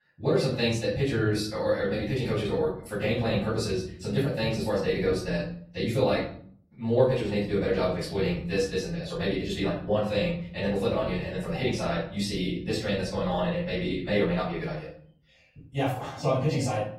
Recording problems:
off-mic speech; far
wrong speed, natural pitch; too fast; 1.6 times normal speed
room echo; noticeable; dies away in 0.5 s
garbled, watery; slightly; nothing above 14.5 kHz

